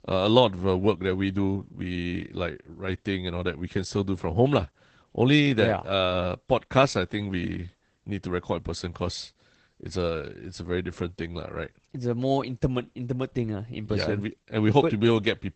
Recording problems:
garbled, watery; badly; nothing above 8 kHz

